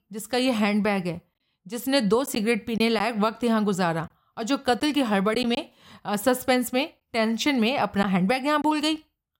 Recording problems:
choppy; occasionally; 2% of the speech affected

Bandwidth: 16 kHz